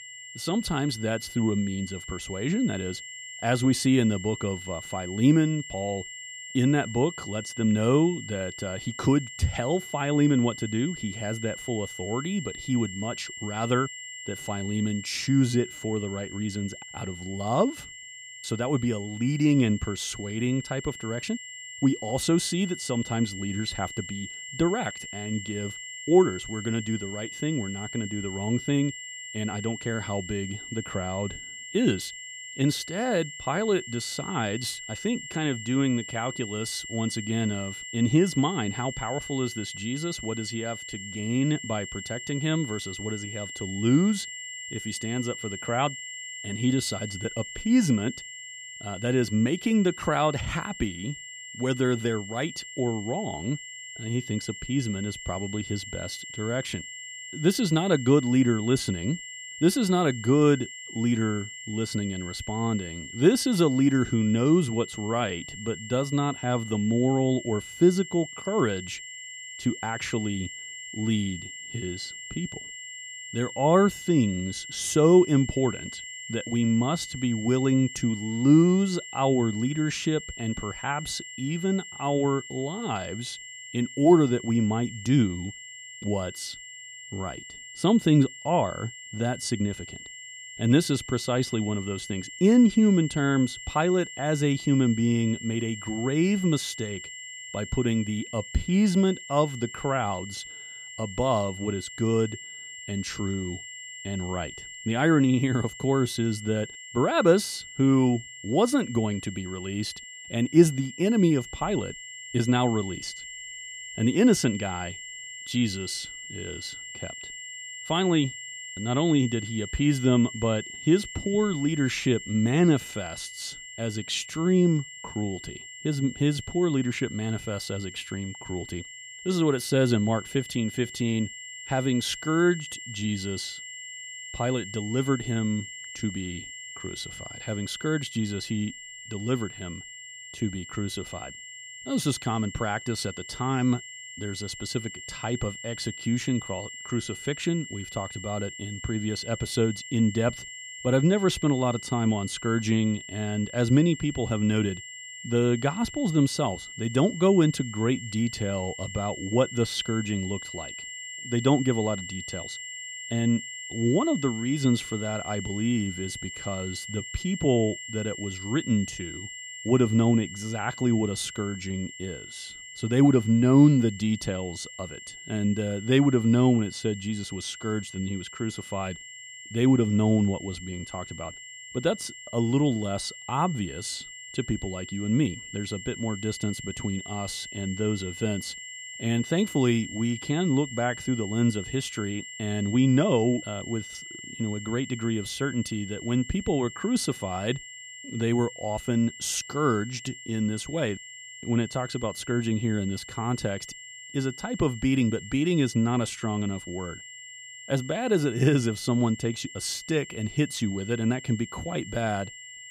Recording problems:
high-pitched whine; noticeable; throughout; 2 kHz, 10 dB below the speech

